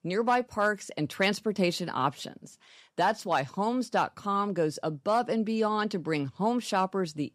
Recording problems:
none

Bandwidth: 15 kHz